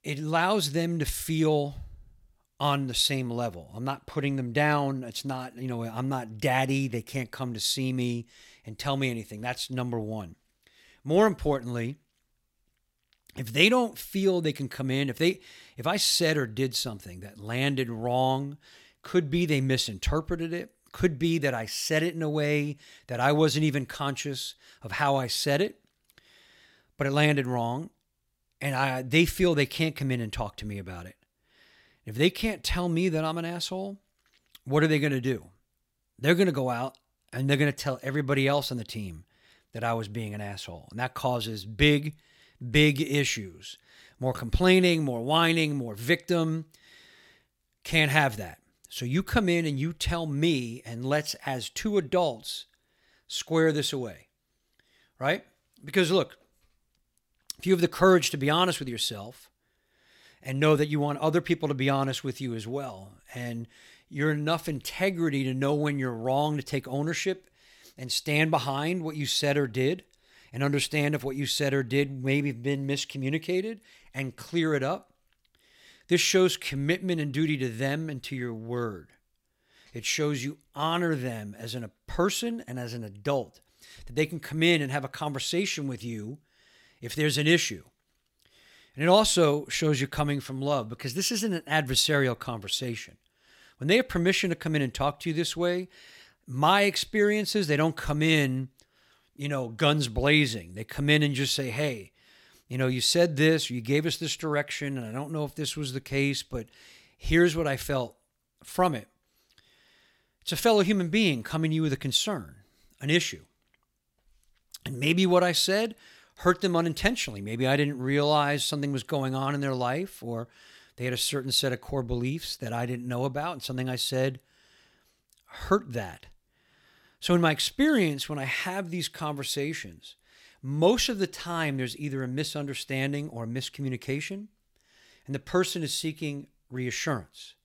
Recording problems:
none

